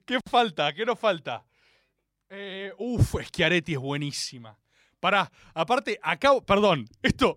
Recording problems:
none

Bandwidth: 16 kHz